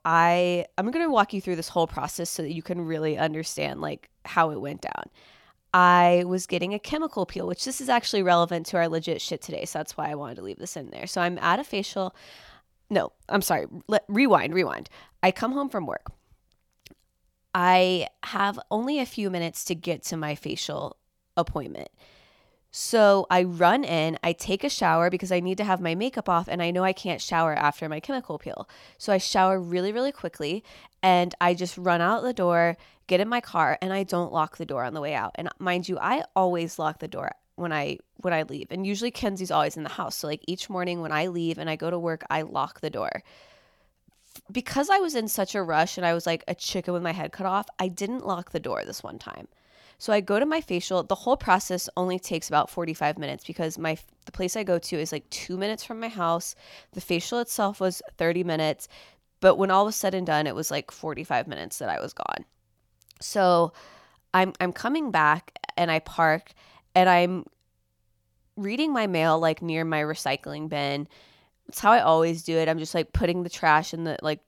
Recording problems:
none

